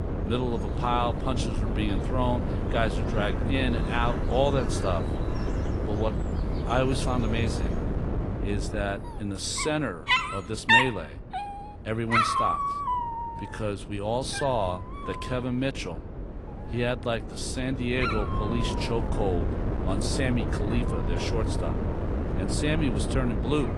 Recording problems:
garbled, watery; slightly
animal sounds; very loud; throughout; 1 dB above the speech
wind noise on the microphone; heavy; 6 dB below the speech

